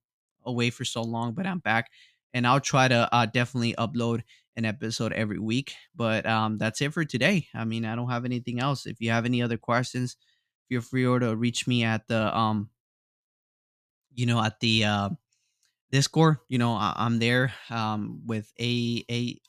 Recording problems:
none

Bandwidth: 14.5 kHz